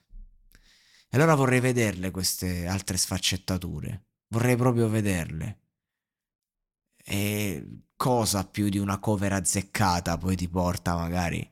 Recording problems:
none

